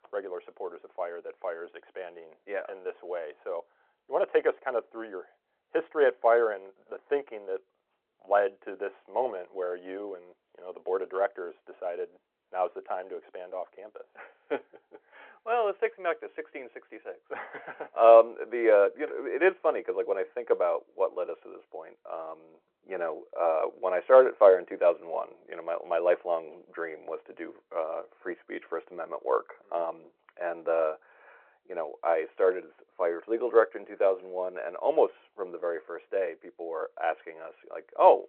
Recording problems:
phone-call audio

